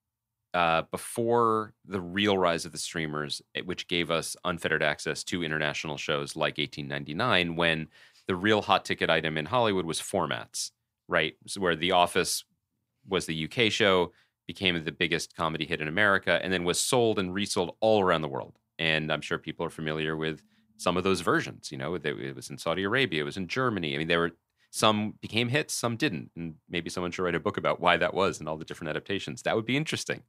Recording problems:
none

